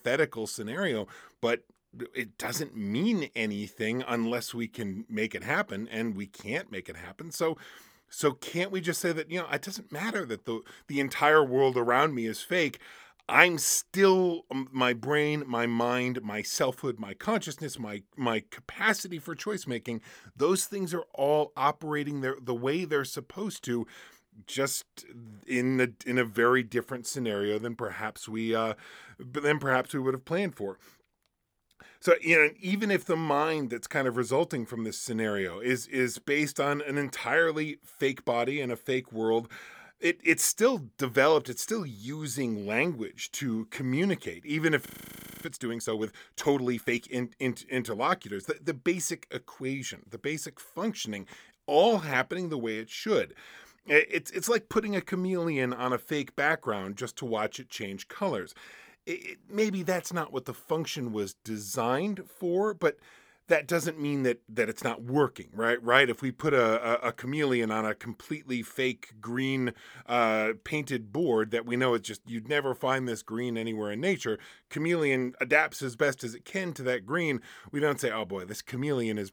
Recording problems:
audio freezing; at 45 s for 0.5 s

